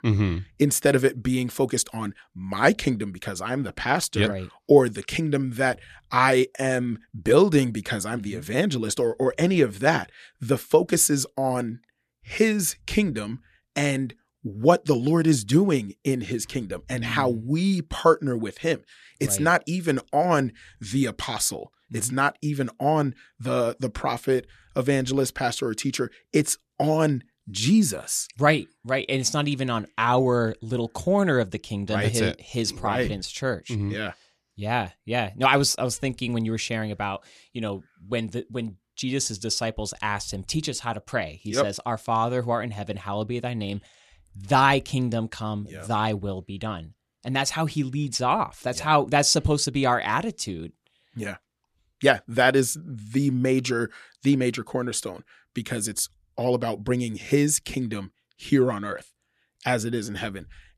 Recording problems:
none

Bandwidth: 14 kHz